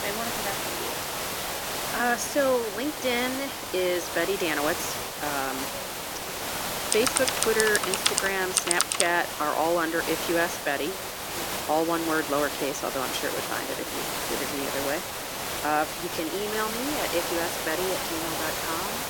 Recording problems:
thin; very slightly; fading below 350 Hz
hiss; loud; throughout; 2 dB below the speech
background chatter; noticeable; throughout; 3 voices, 20 dB below the speech
keyboard typing; loud; from 7 to 9 s; peak 5 dB above the speech

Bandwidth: 17 kHz